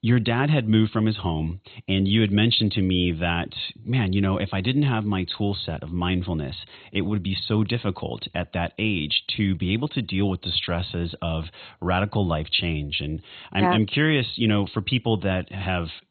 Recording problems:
garbled, watery; badly; nothing above 4 kHz

